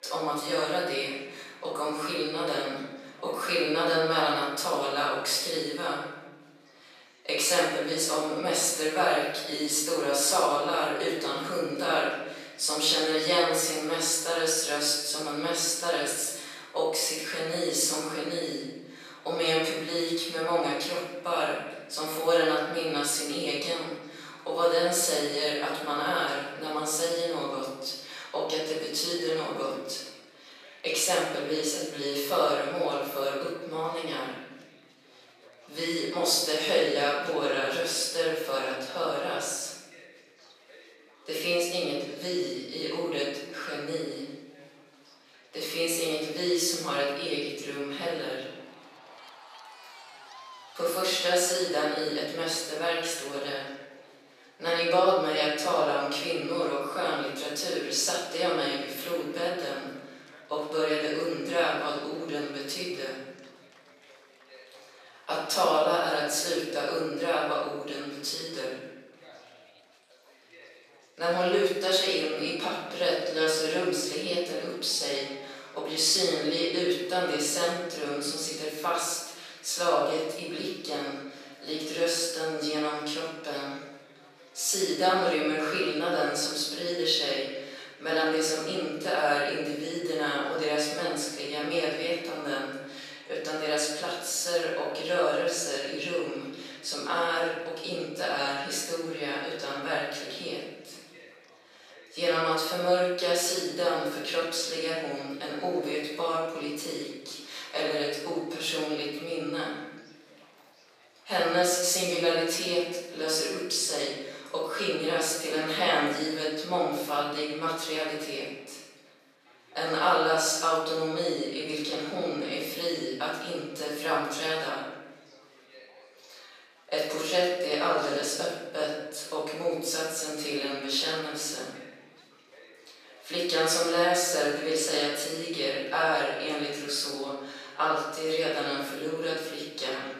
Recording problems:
off-mic speech; far
room echo; noticeable; dies away in 1.1 s
thin; somewhat; fading below 500 Hz
chatter from many people; faint; throughout; 25 dB below the speech

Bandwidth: 14.5 kHz